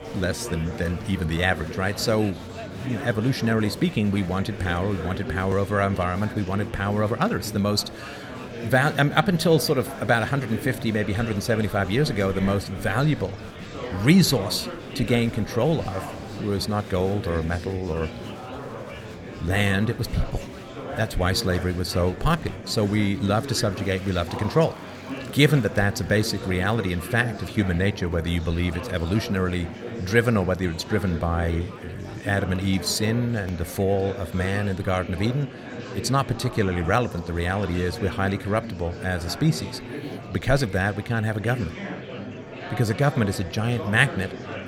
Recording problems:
murmuring crowd; noticeable; throughout; 10 dB below the speech

